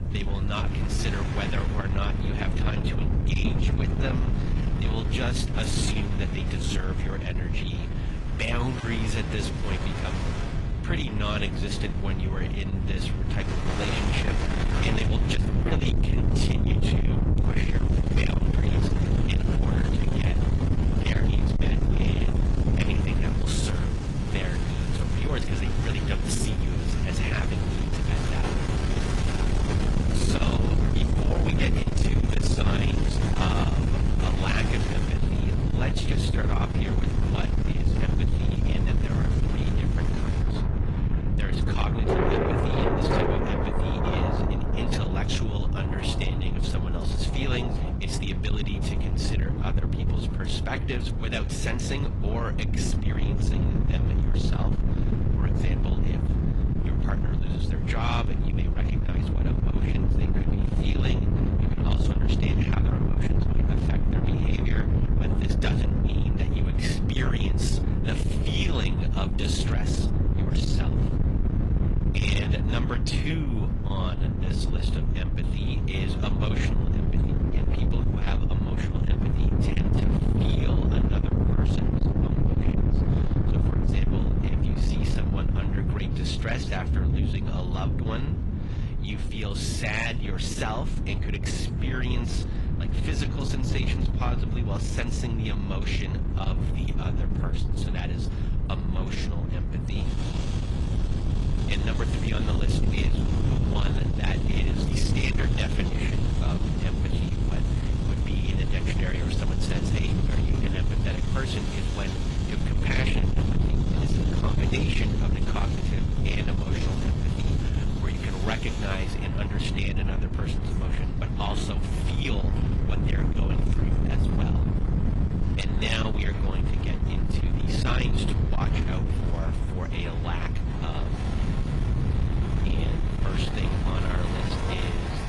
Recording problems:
distortion; heavy; 8 dB below the speech
garbled, watery; slightly; nothing above 10.5 kHz
wind noise on the microphone; heavy; 2 dB below the speech
rain or running water; loud; throughout; 4 dB below the speech

